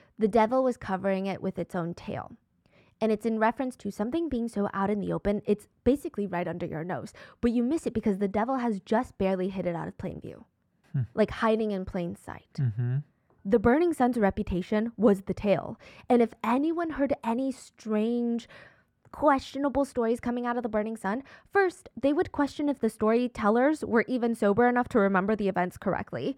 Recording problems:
muffled; slightly; fading above 2.5 kHz

